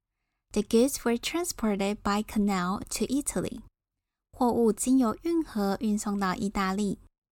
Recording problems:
none

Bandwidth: 17.5 kHz